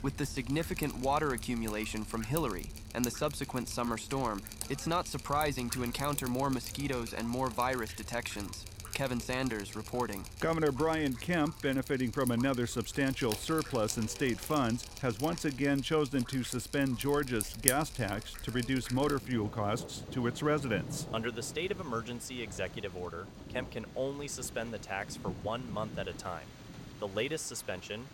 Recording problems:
rain or running water; loud; throughout; 9 dB below the speech

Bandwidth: 16.5 kHz